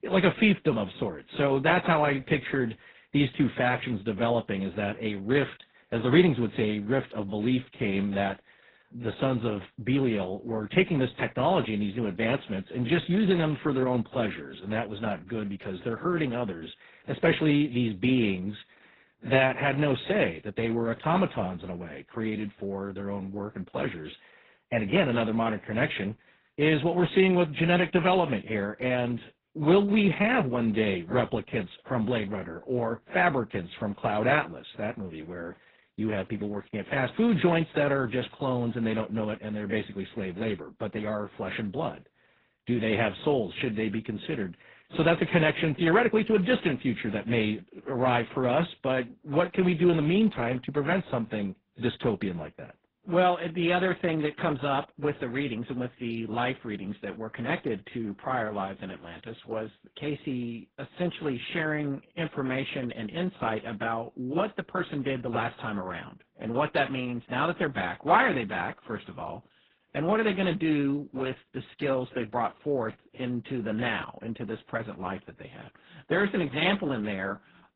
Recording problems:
garbled, watery; badly; nothing above 4 kHz

